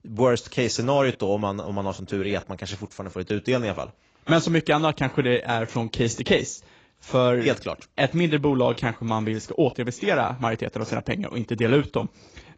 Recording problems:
garbled, watery; badly; nothing above 7.5 kHz

